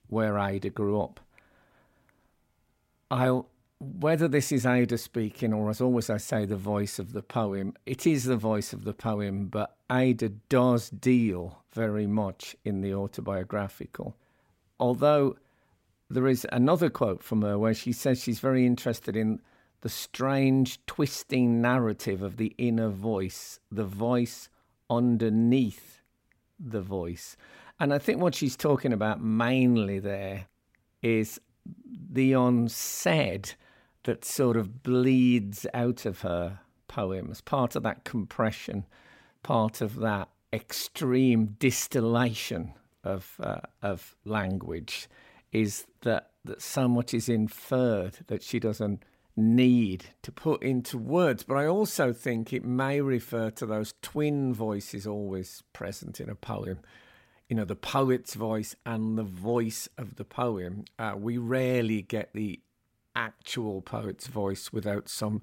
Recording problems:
none

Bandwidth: 16 kHz